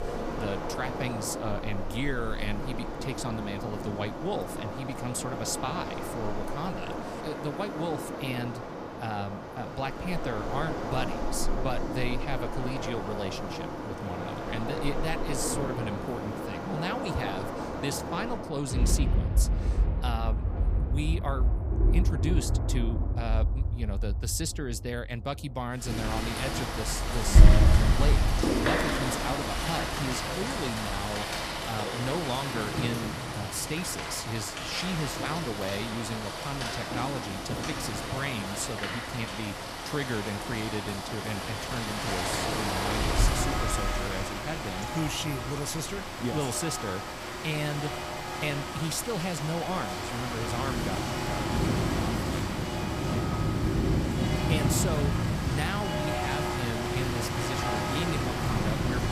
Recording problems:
rain or running water; very loud; throughout; 4 dB above the speech

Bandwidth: 15 kHz